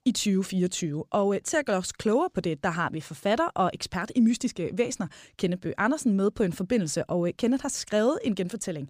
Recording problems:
none

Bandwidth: 15 kHz